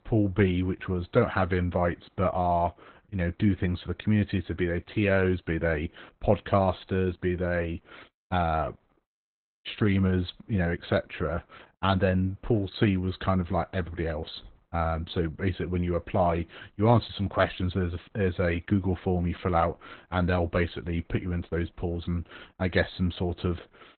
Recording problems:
garbled, watery; badly; nothing above 4 kHz

